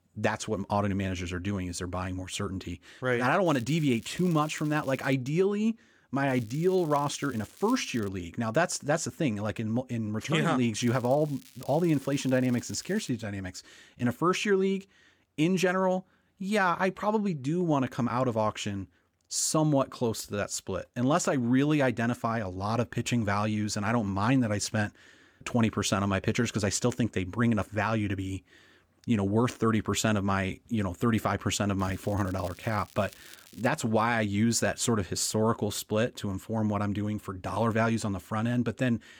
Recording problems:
crackling; faint; 4 times, first at 3.5 s; 25 dB below the speech

